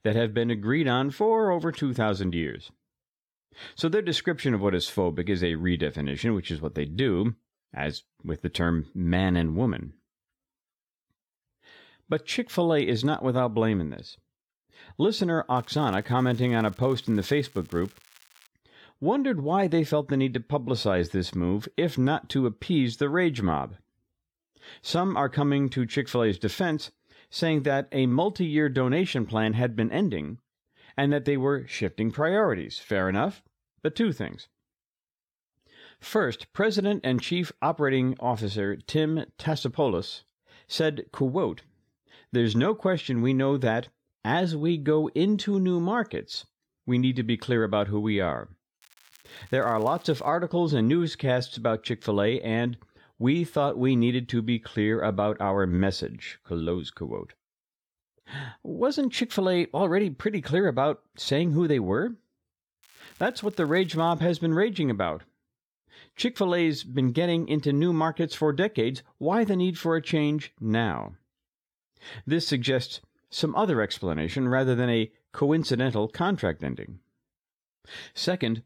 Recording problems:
crackling; faint; from 16 to 18 s, from 49 to 50 s and from 1:03 to 1:04; 30 dB below the speech

